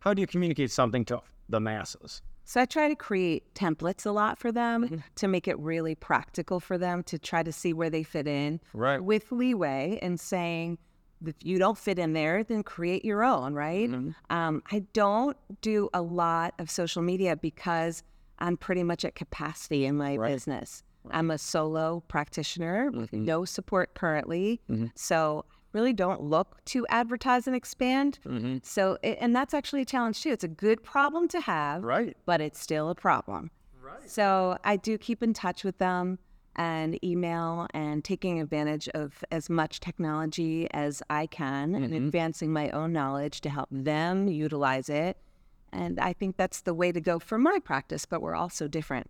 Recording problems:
none

